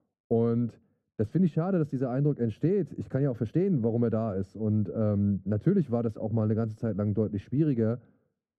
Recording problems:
muffled; very; fading above 1 kHz

